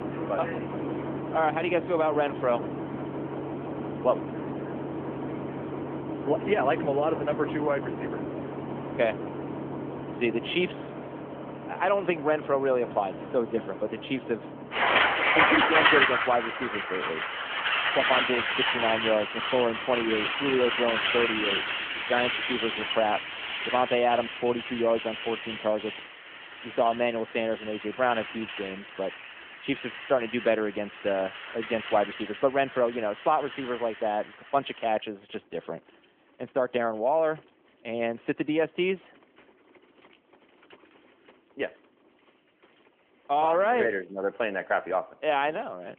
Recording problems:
phone-call audio; nothing above 3.5 kHz
traffic noise; loud; throughout; 1 dB below the speech

